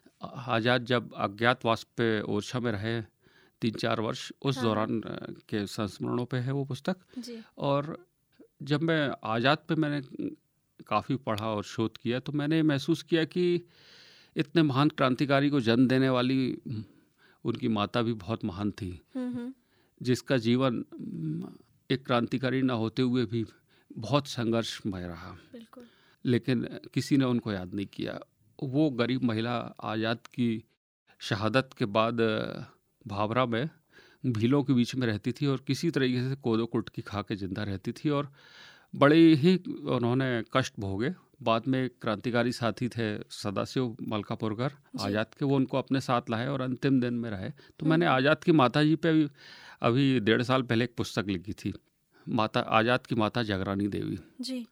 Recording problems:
none

